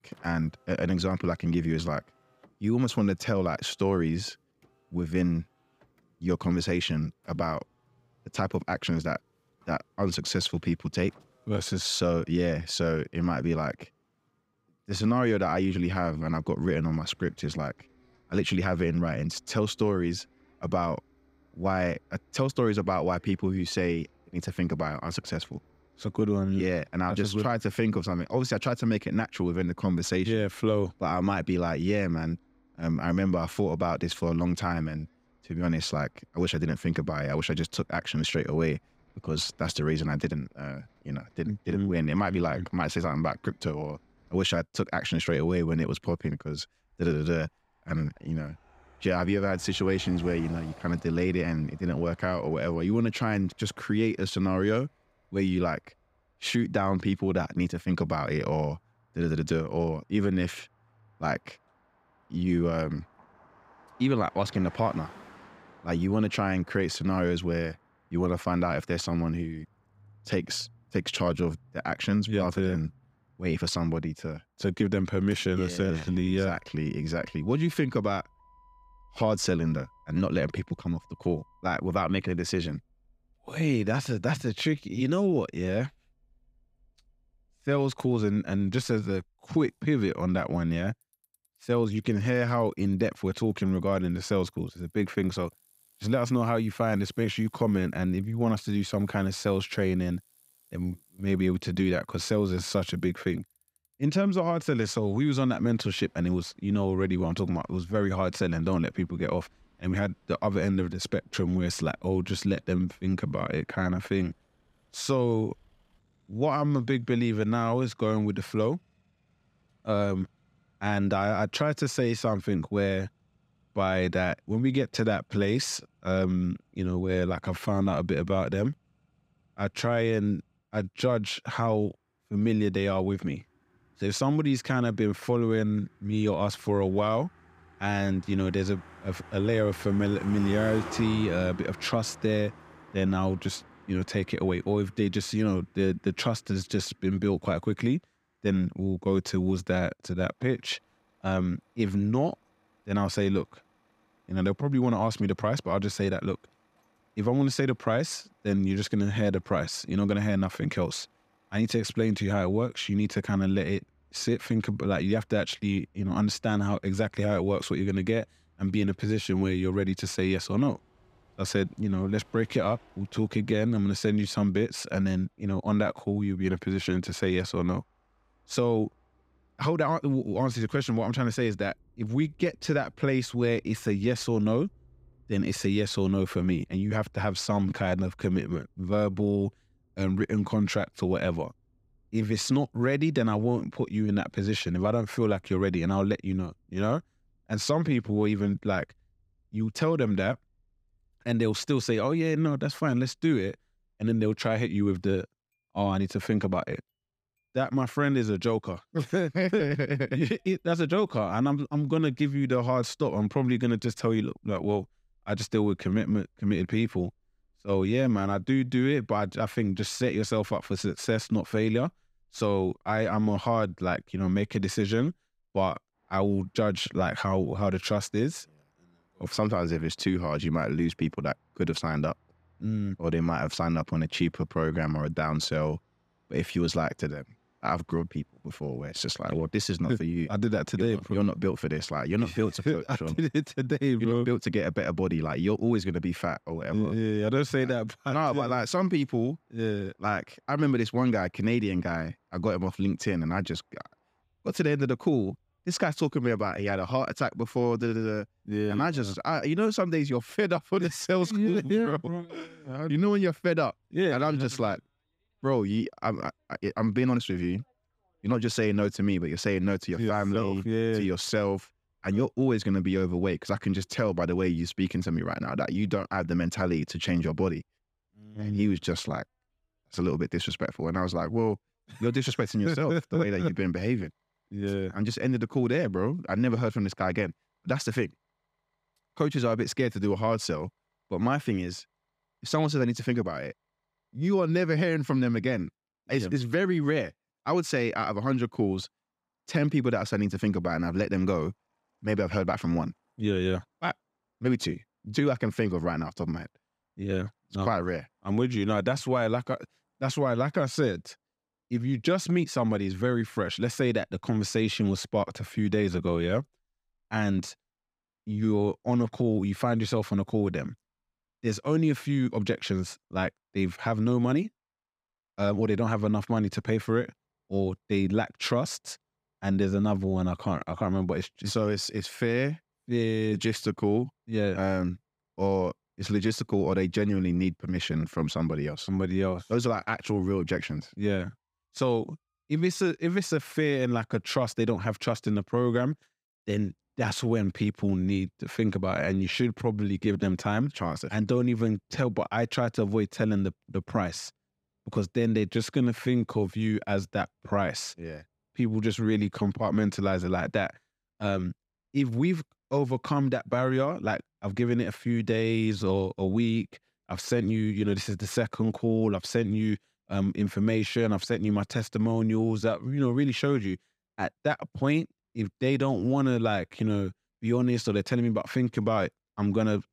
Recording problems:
traffic noise; faint; throughout; 25 dB below the speech

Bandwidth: 15.5 kHz